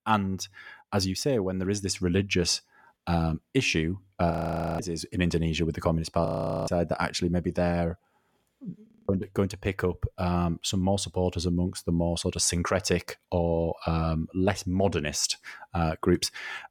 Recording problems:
audio freezing; at 4.5 s, at 6.5 s and at 9 s

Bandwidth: 17.5 kHz